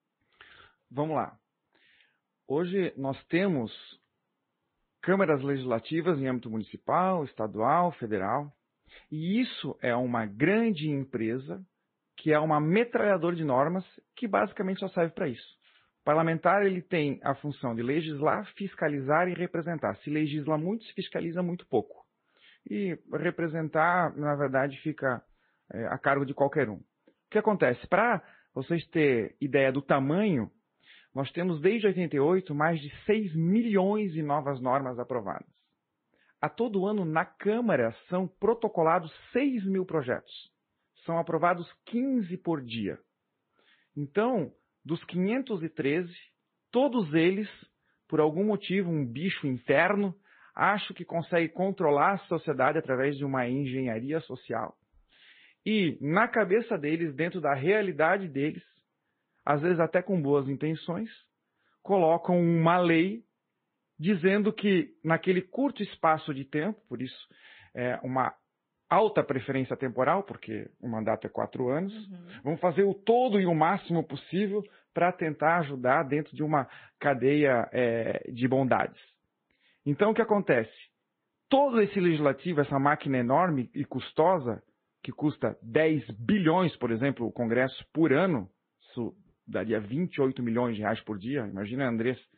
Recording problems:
high frequencies cut off; severe; nothing above 4 kHz
garbled, watery; slightly

